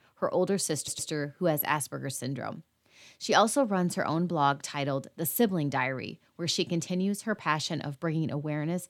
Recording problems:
audio stuttering; at 1 s

